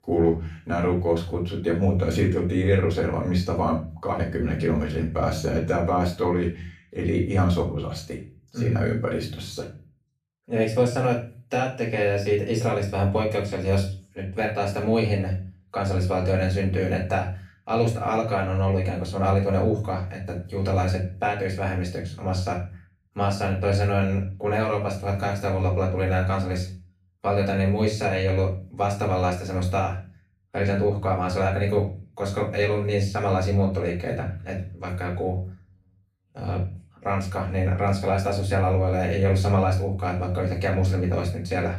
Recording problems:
off-mic speech; far
room echo; slight; dies away in 0.4 s

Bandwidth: 14.5 kHz